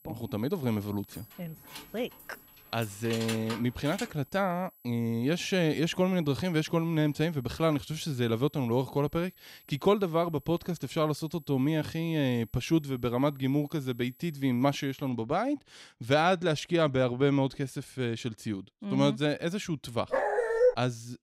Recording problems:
high-pitched whine; faint; until 15 s; 11.5 kHz, 25 dB below the speech
jangling keys; noticeable; from 1 to 4 s; peak 7 dB below the speech
dog barking; loud; at 20 s; peak 5 dB above the speech

